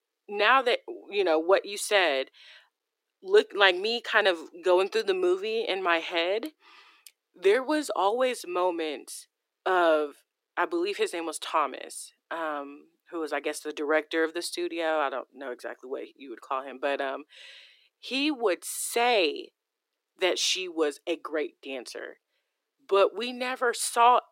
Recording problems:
thin; very; fading below 350 Hz

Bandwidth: 16 kHz